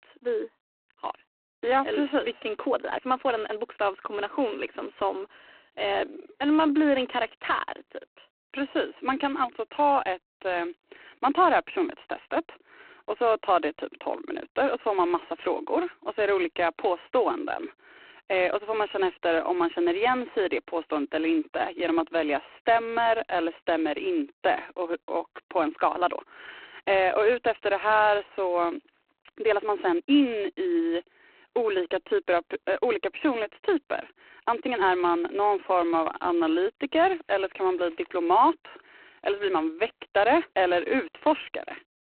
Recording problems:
phone-call audio; poor line; nothing above 4 kHz
uneven, jittery; strongly; from 1.5 to 37 s

